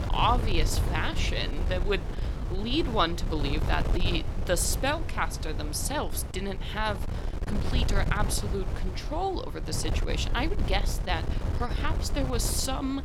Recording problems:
wind noise on the microphone; heavy; 10 dB below the speech

